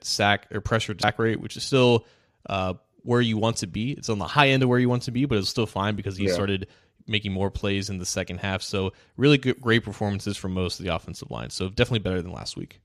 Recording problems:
none

